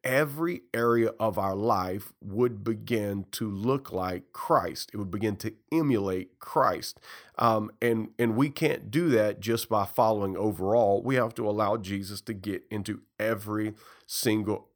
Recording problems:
none

